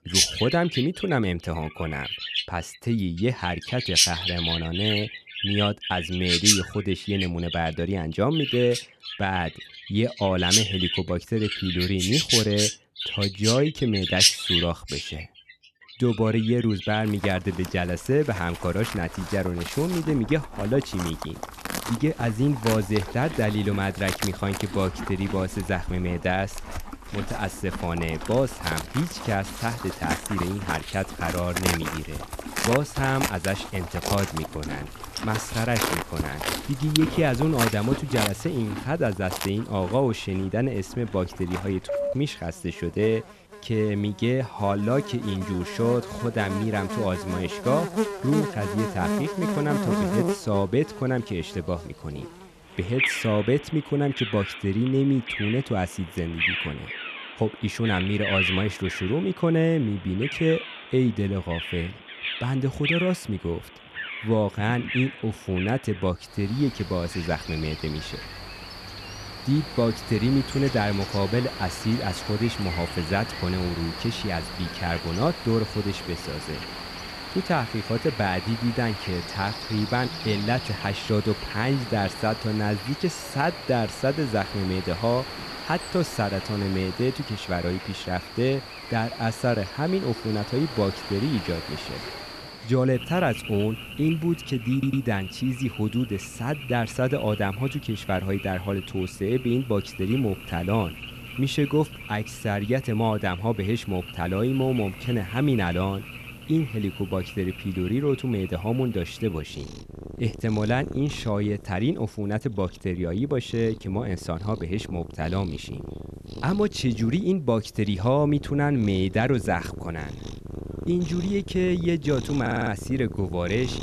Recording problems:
animal sounds; loud; throughout; 5 dB below the speech
audio stuttering; at 1:35 and at 2:02

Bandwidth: 13.5 kHz